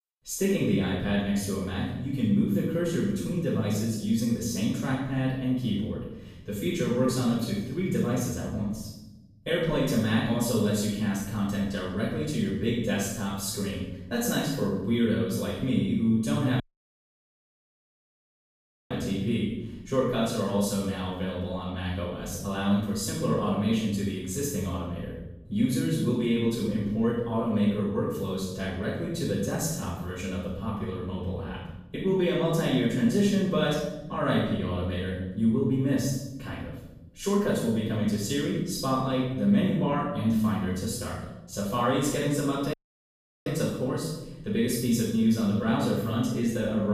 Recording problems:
room echo; strong; dies away in 0.8 s
off-mic speech; far
audio cutting out; at 17 s for 2.5 s and at 43 s for 0.5 s
abrupt cut into speech; at the end

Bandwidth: 15 kHz